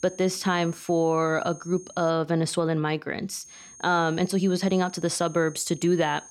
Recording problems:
high-pitched whine; noticeable; until 2 s and from 3.5 s on; 6.5 kHz, 20 dB below the speech

